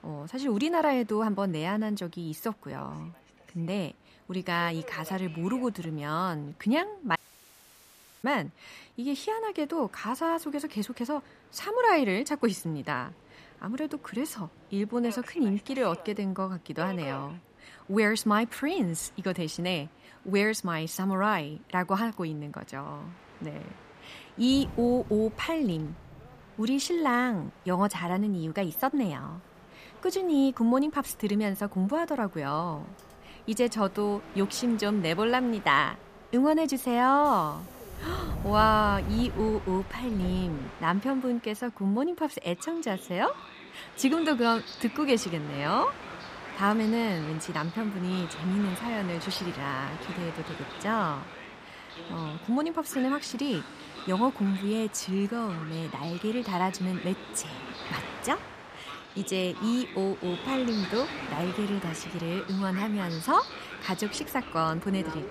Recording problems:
train or aircraft noise; noticeable; throughout; 15 dB below the speech
audio cutting out; at 7 s for 1 s

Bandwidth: 14.5 kHz